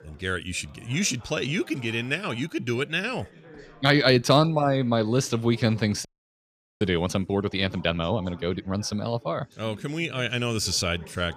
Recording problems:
background chatter; faint; throughout; 4 voices, 25 dB below the speech
audio freezing; at 6 s for 1 s

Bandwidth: 14.5 kHz